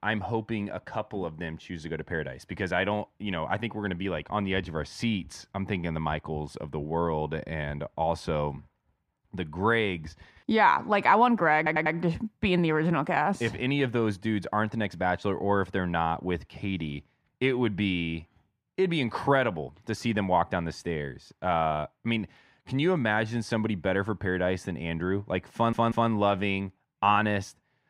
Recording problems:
muffled; slightly; fading above 3.5 kHz
audio stuttering; at 12 s and at 26 s

